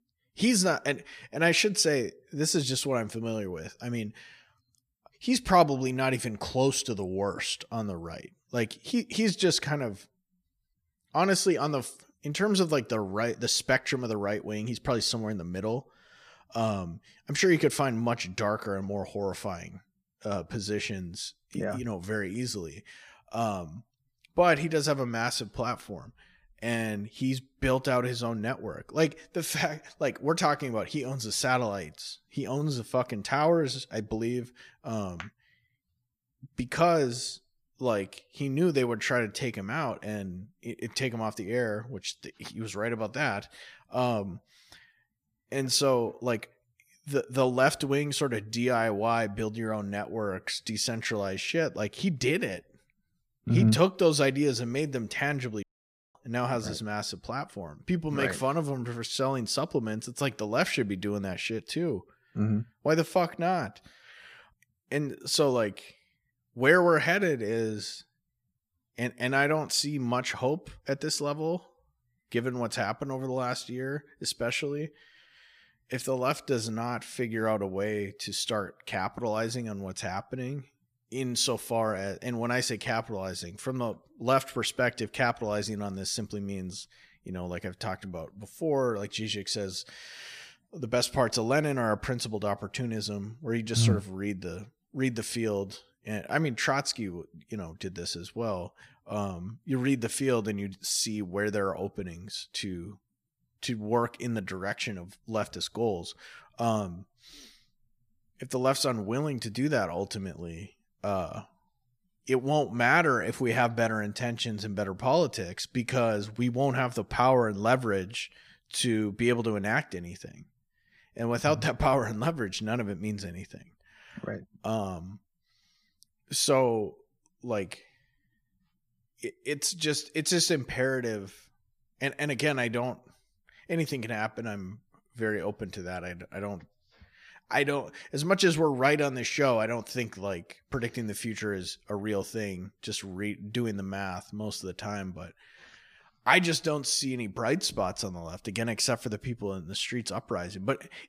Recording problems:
audio cutting out; at 56 s for 0.5 s

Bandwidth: 15 kHz